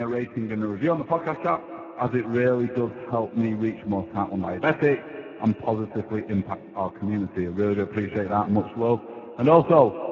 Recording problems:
garbled, watery; badly; nothing above 7 kHz
echo of what is said; noticeable; throughout; 230 ms later, 15 dB below the speech
abrupt cut into speech; at the start

